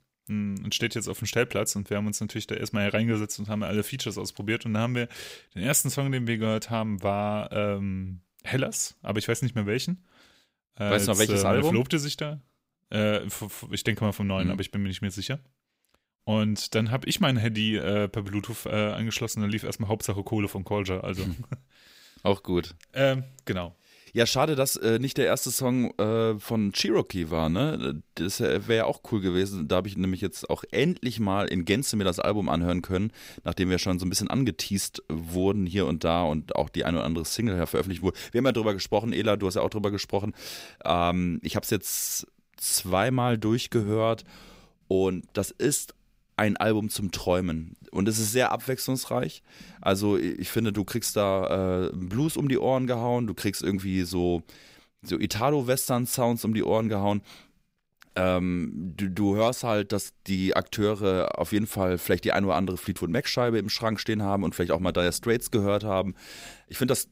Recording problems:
none

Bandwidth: 15.5 kHz